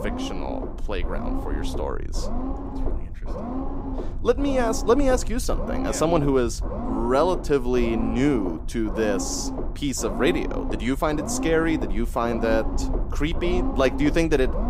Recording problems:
low rumble; loud; throughout; 9 dB below the speech

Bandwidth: 15.5 kHz